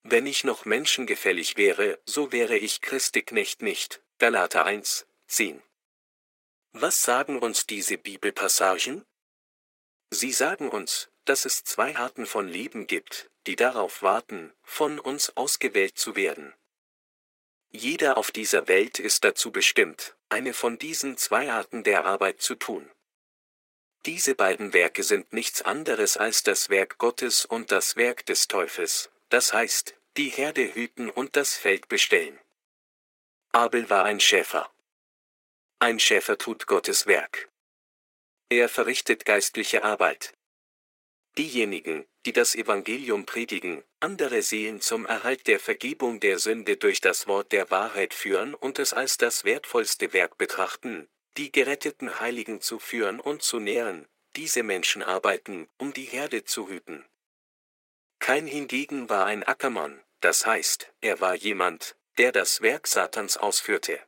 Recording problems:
thin; very; fading below 400 Hz

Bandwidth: 16 kHz